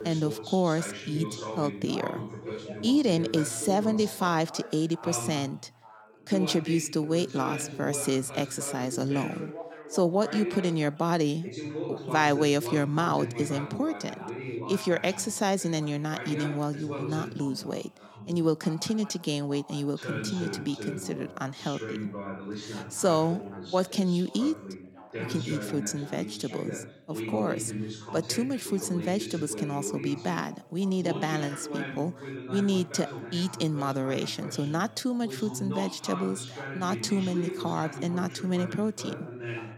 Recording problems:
background chatter; loud; throughout; 2 voices, 9 dB below the speech

